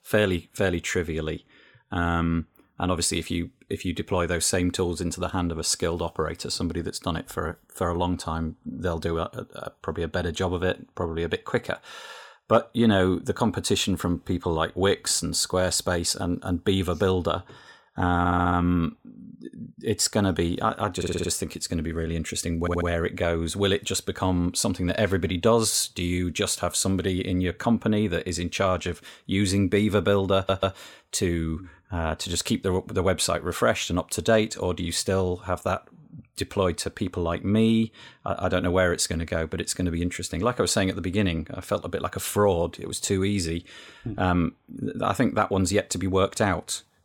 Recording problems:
audio stuttering; 4 times, first at 18 s

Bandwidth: 17 kHz